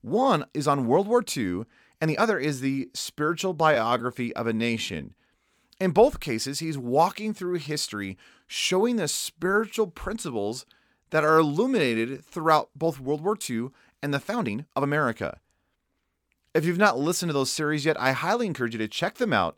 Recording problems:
uneven, jittery; strongly; from 2 to 19 s

